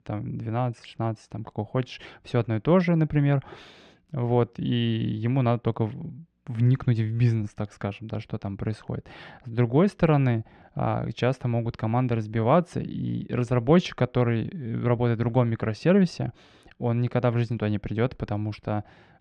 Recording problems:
muffled; slightly; fading above 2.5 kHz

